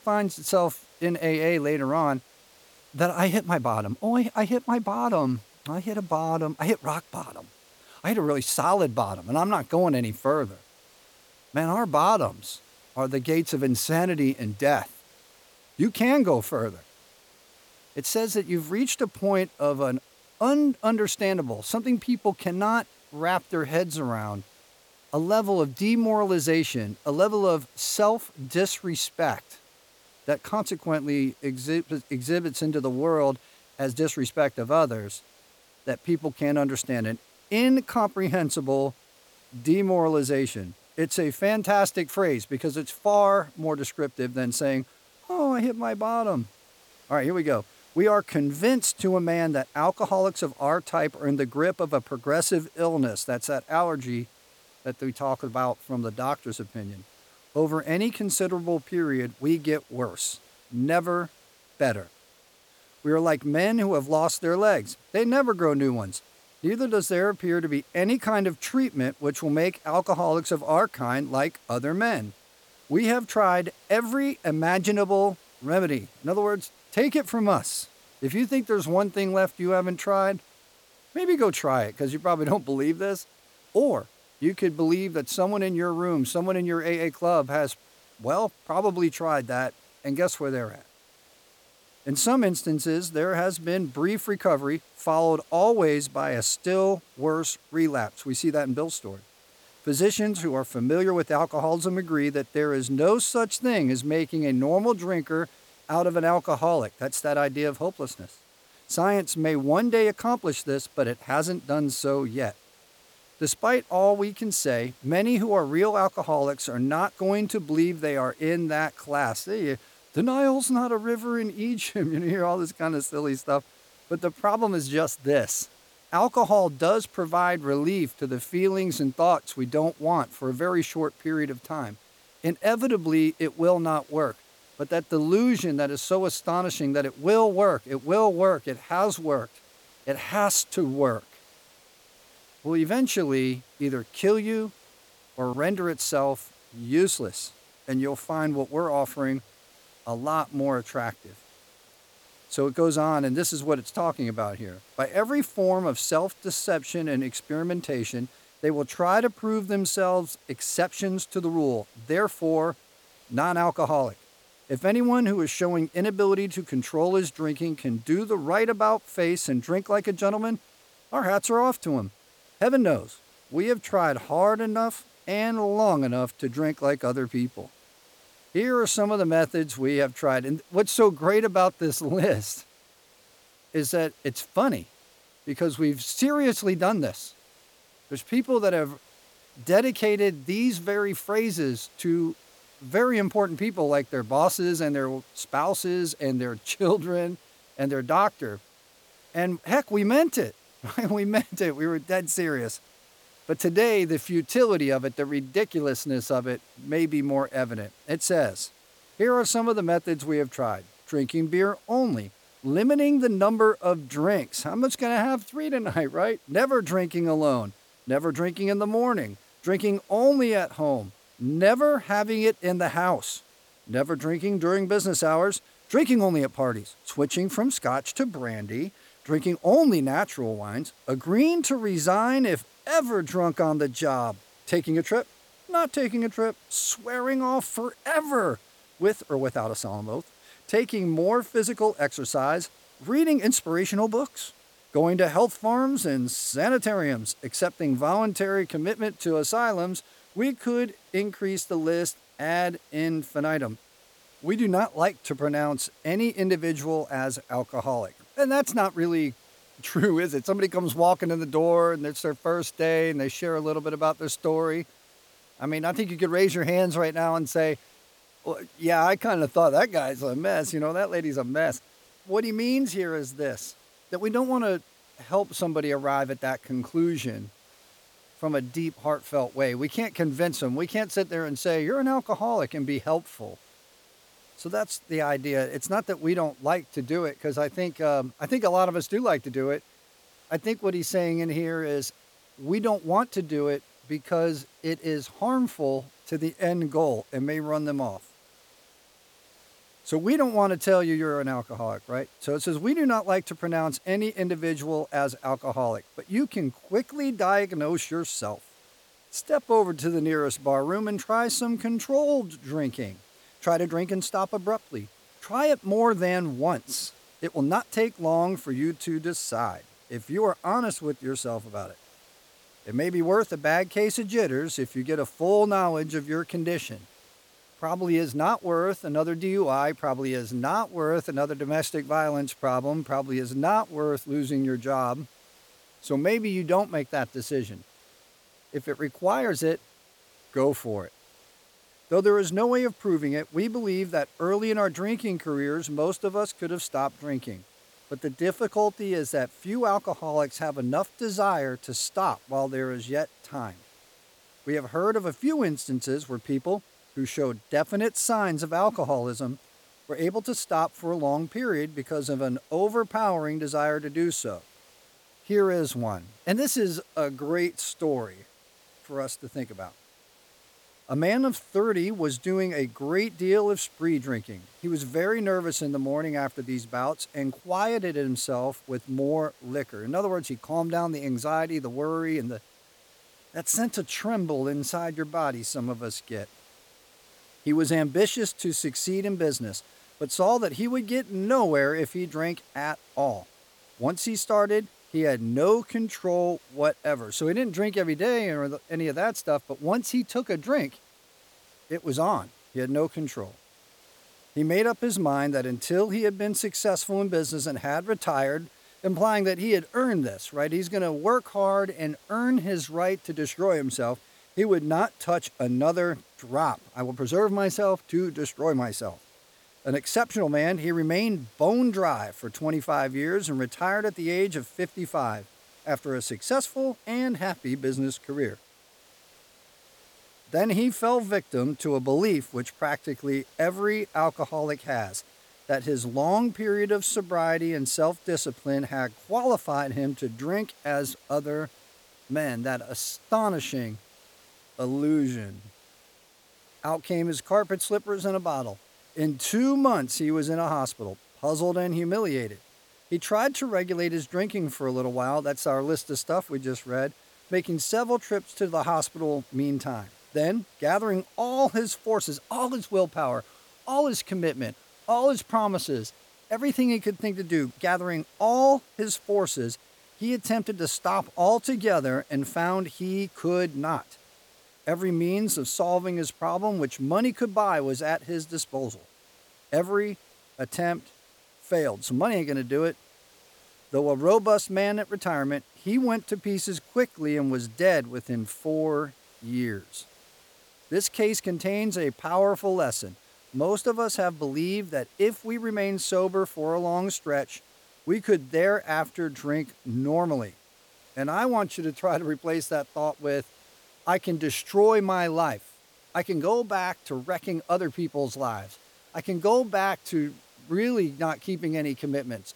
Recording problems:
hiss; faint; throughout; 30 dB below the speech

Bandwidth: 18.5 kHz